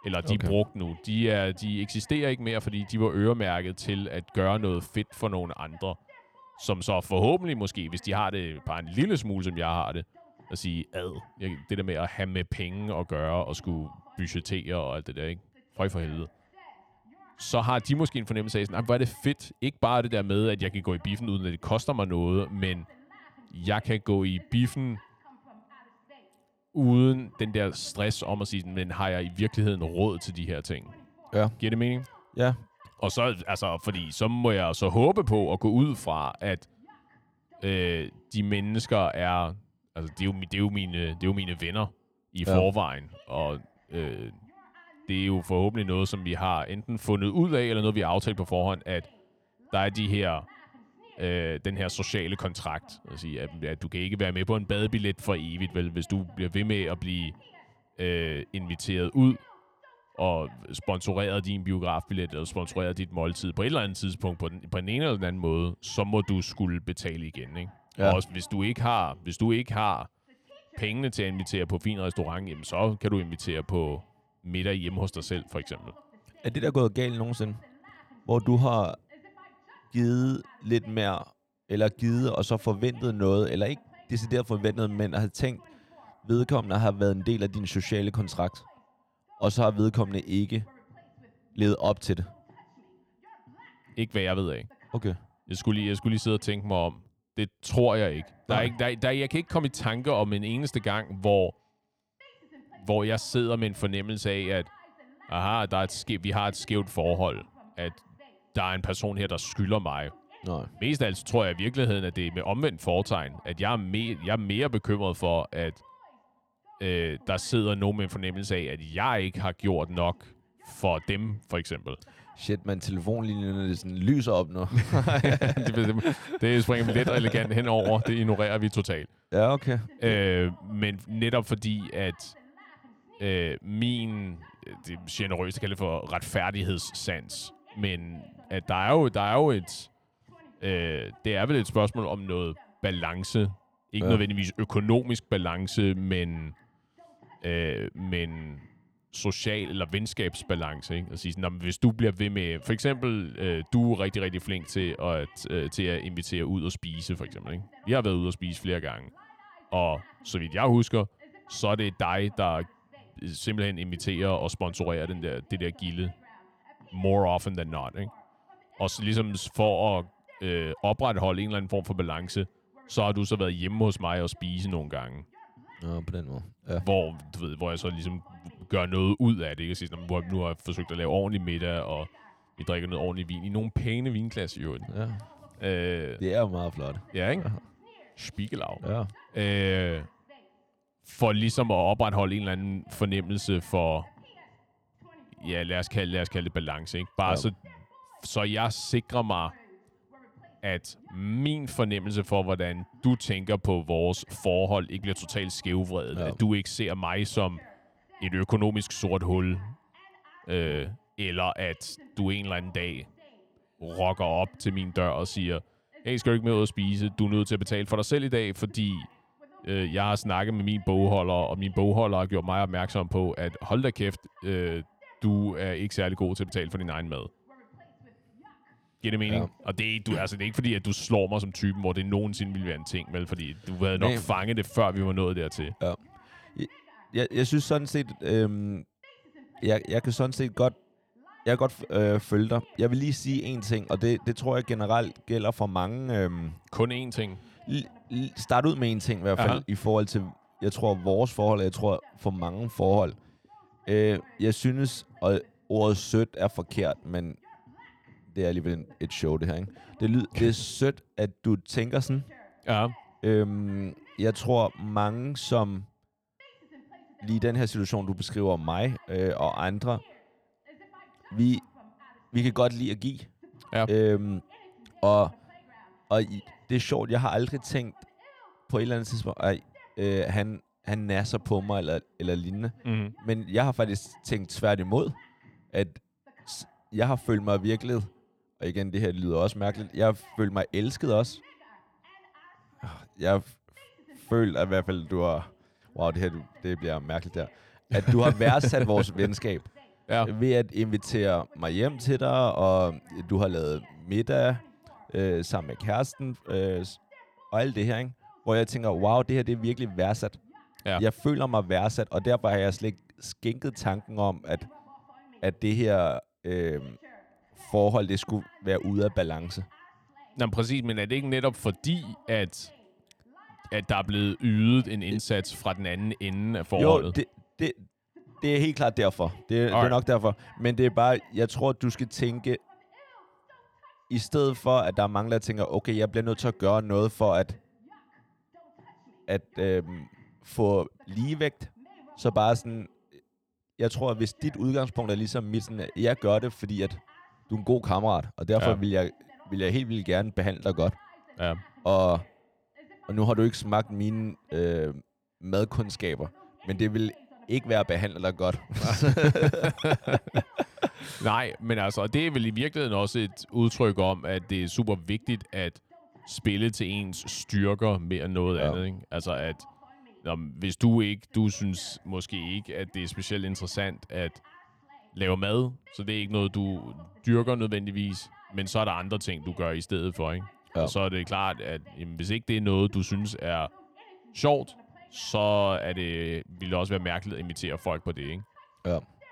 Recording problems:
voice in the background; faint; throughout; 25 dB below the speech

